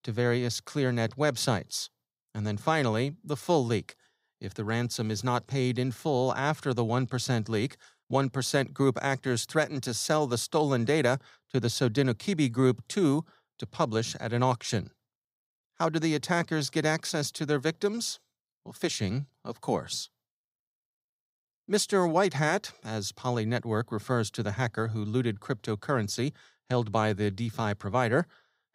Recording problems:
none

